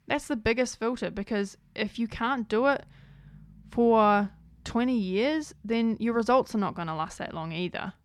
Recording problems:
none

